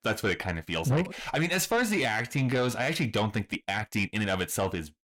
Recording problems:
distortion; slight; 10 dB below the speech
uneven, jittery; strongly; from 0.5 to 4.5 s

